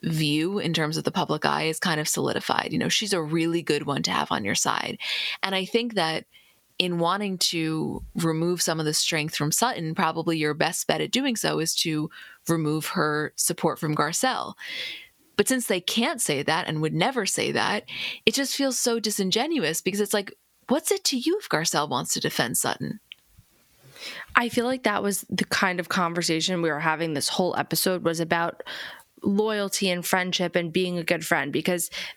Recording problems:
squashed, flat; somewhat

